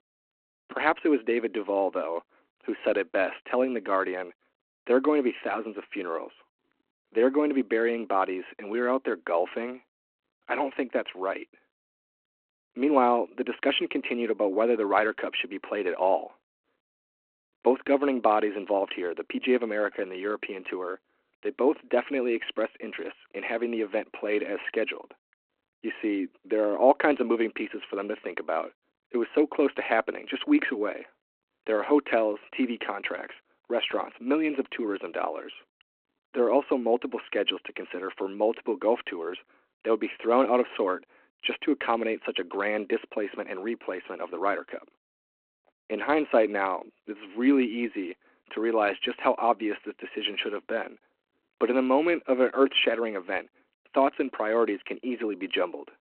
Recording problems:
phone-call audio

